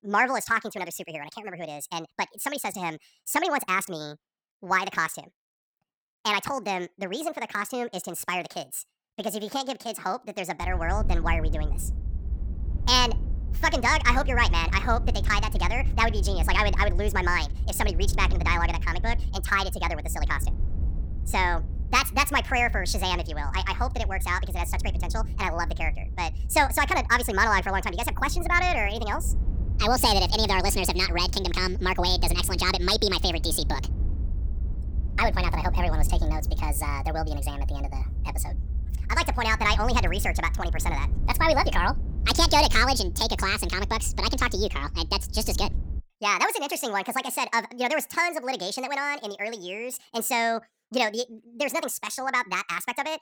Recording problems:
wrong speed and pitch; too fast and too high; 1.6 times normal speed
low rumble; faint; from 11 to 46 s; 20 dB below the speech

